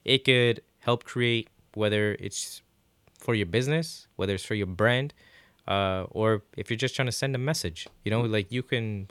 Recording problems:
none

